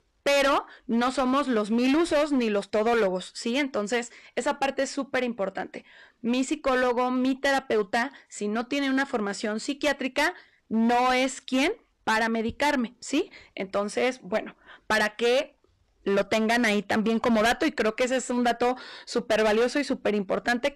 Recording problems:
distortion; heavy; 12% of the sound clipped

